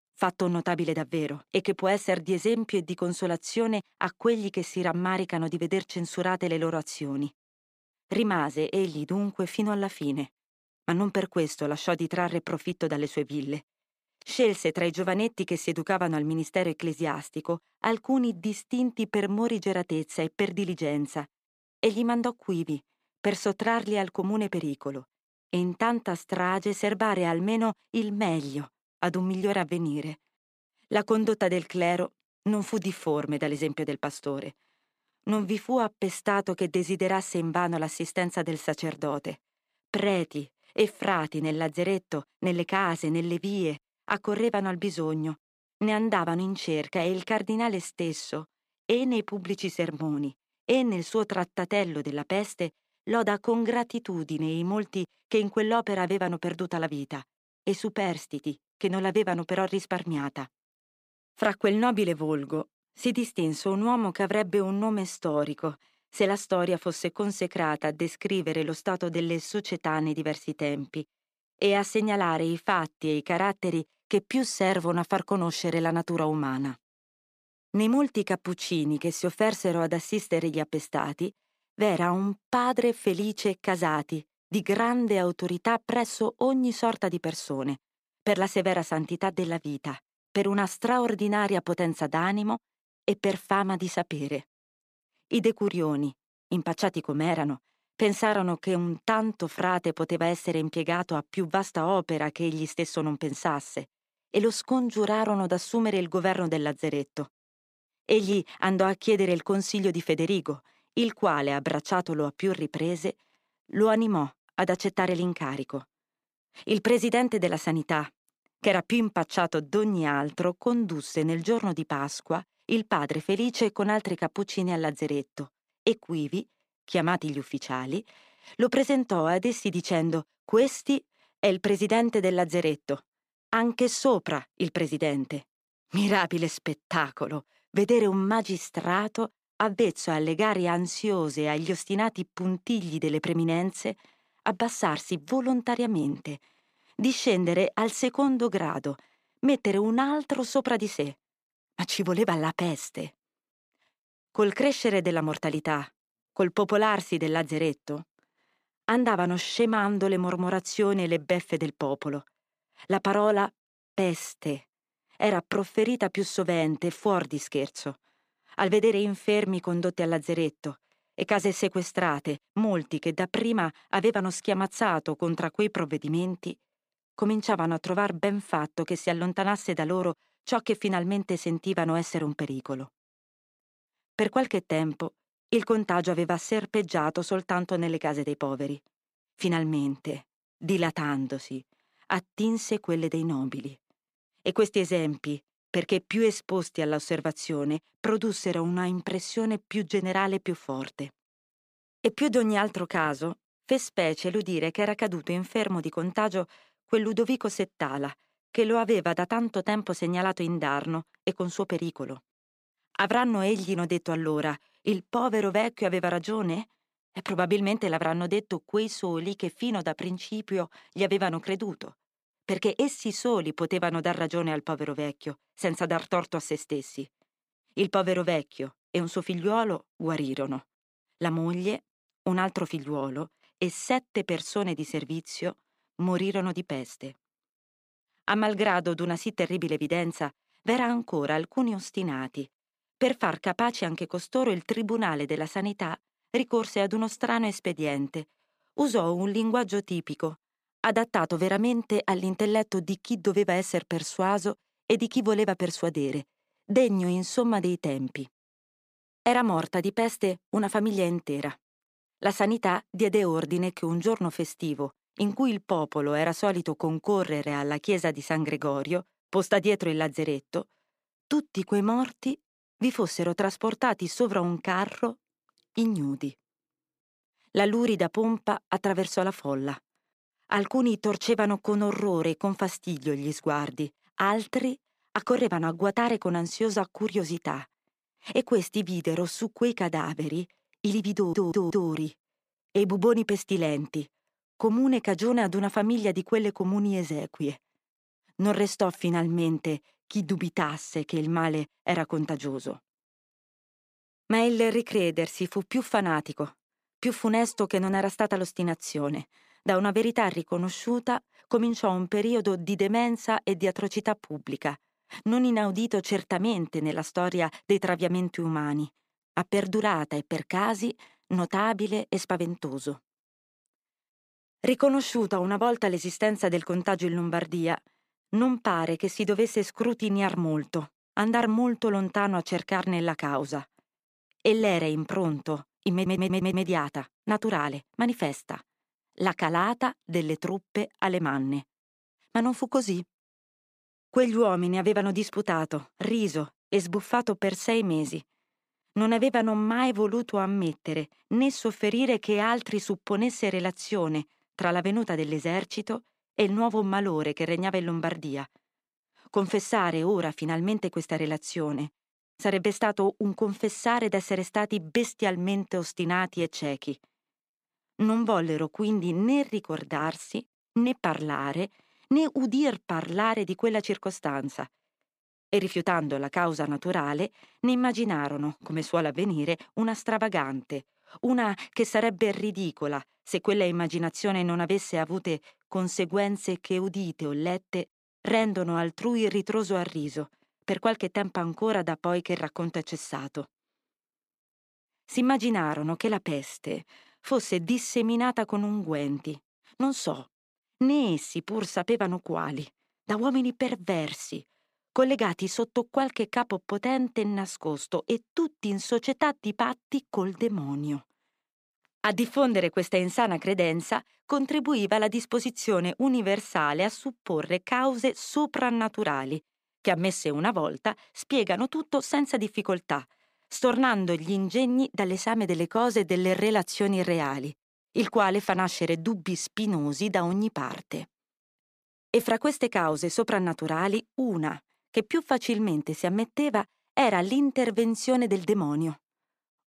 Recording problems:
audio stuttering; at 4:51 and at 5:36

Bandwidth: 15 kHz